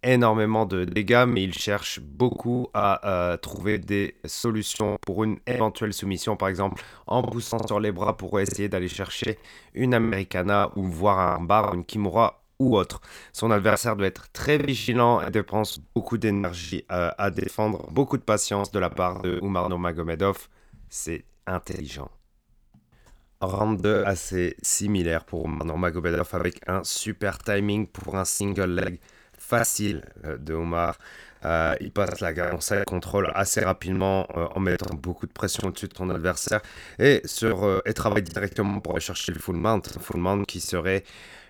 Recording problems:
choppy; very; 14% of the speech affected

